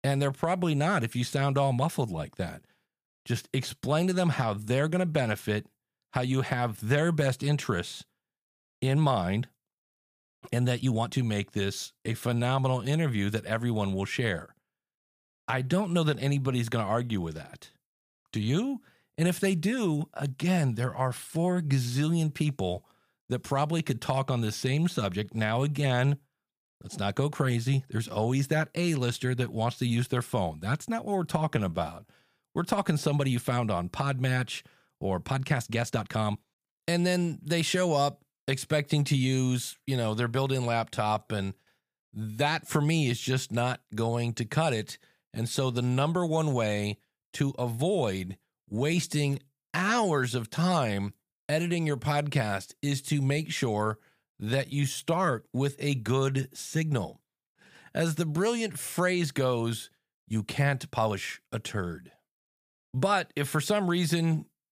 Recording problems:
uneven, jittery; strongly; from 11 s to 1:01

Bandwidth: 15 kHz